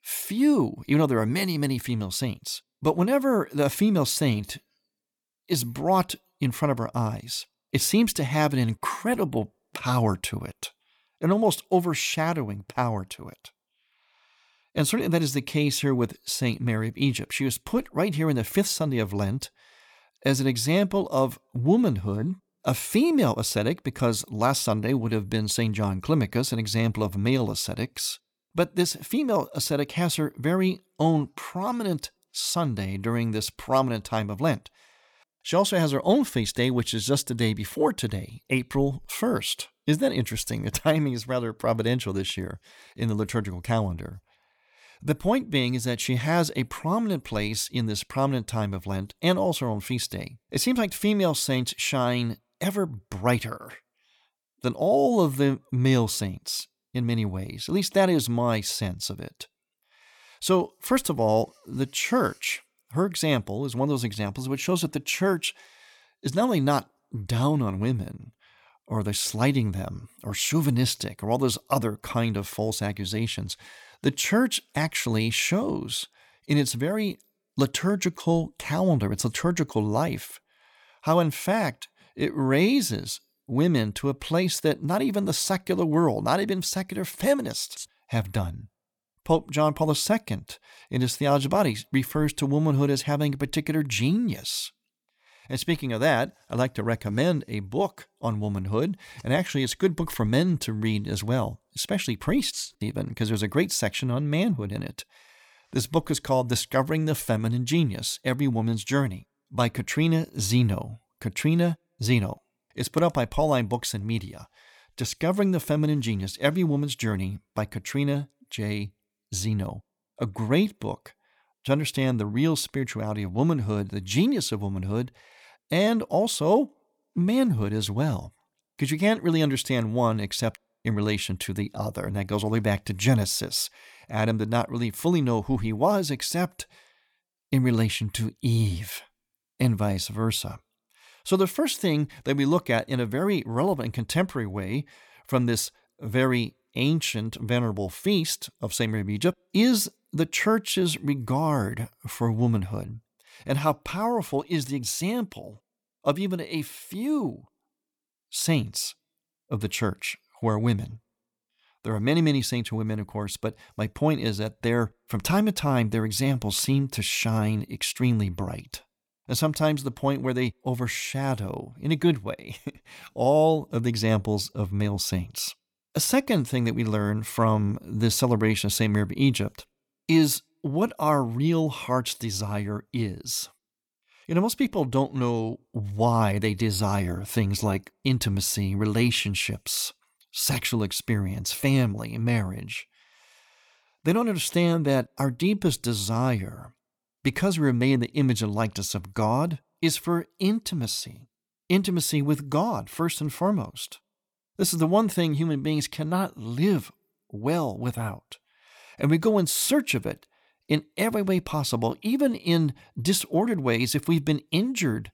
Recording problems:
none

